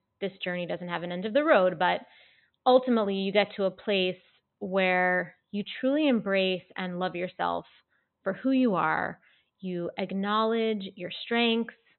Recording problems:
high frequencies cut off; severe; nothing above 4 kHz

